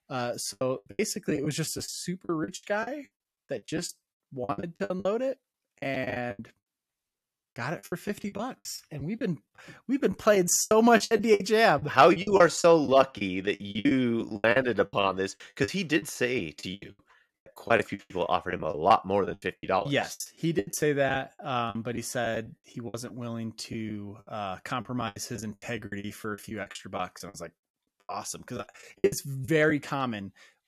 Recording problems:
choppy; very; 19% of the speech affected

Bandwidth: 13.5 kHz